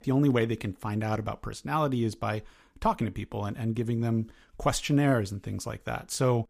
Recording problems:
none

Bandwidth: 15 kHz